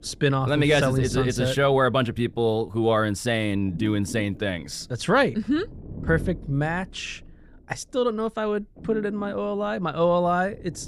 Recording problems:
low rumble; faint; throughout; 20 dB below the speech

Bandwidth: 15 kHz